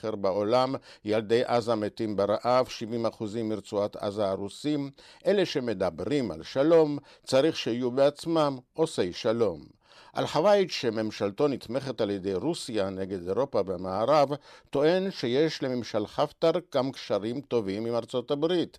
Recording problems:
none

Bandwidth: 14 kHz